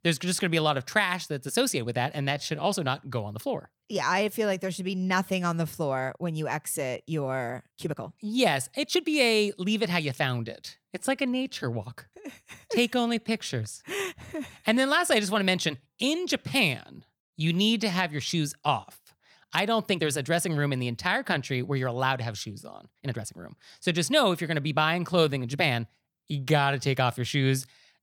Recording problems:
uneven, jittery; strongly; from 2 to 27 s

